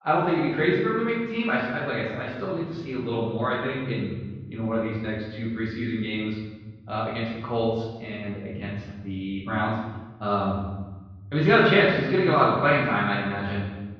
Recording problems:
off-mic speech; far
room echo; noticeable; dies away in 1.3 s
muffled; slightly; fading above 4 kHz

